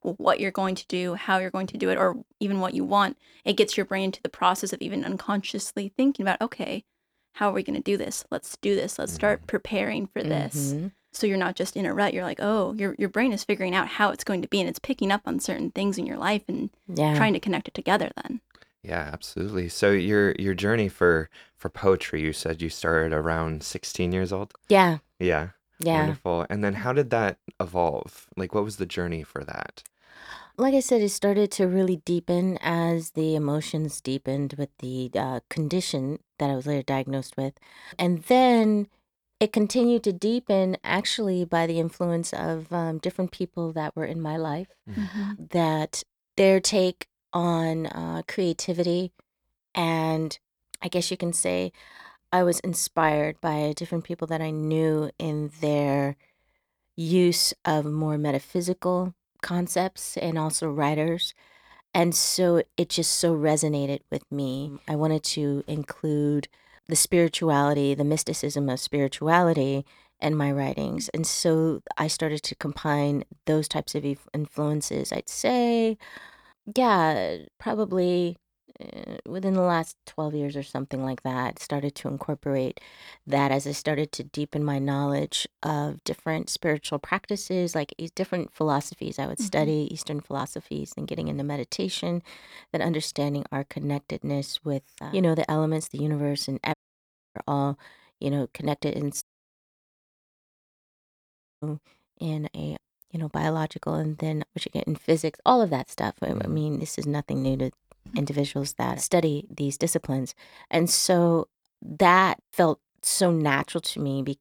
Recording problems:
audio cutting out; at 1:37 for 0.5 s and at 1:39 for 2.5 s

